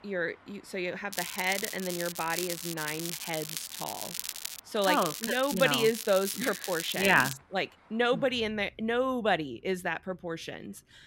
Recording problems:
crackling; loud; from 1 to 4.5 s and from 5 to 7.5 s; 7 dB below the speech
traffic noise; faint; throughout; 30 dB below the speech

